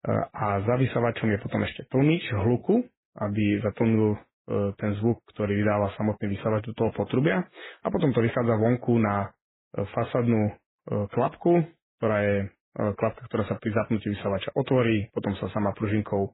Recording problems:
garbled, watery; badly; nothing above 4 kHz

